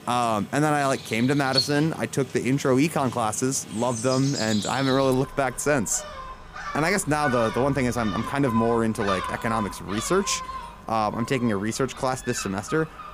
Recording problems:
animal sounds; loud; throughout; 9 dB below the speech

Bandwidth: 15 kHz